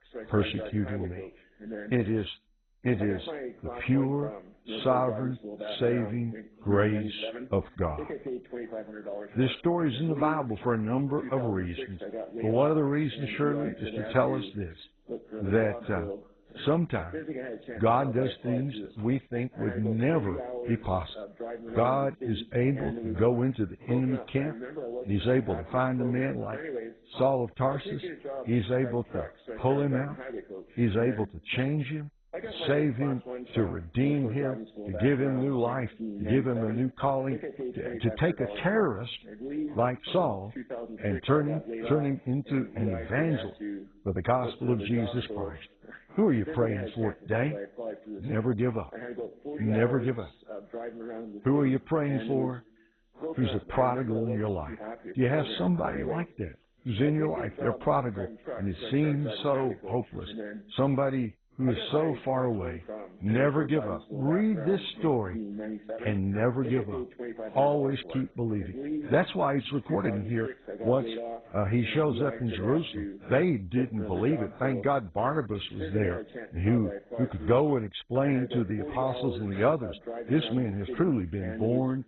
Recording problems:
garbled, watery; badly; nothing above 4 kHz
voice in the background; noticeable; throughout; 10 dB below the speech

